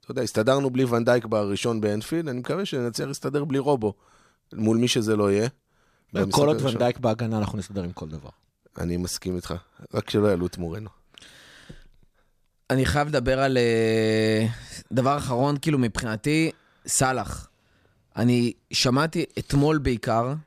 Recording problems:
none

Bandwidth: 14.5 kHz